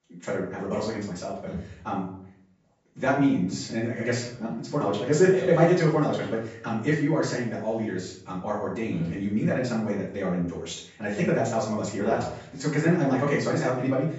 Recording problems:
off-mic speech; far
wrong speed, natural pitch; too fast; 1.6 times normal speed
room echo; noticeable; dies away in 0.5 s
high frequencies cut off; noticeable; nothing above 8 kHz

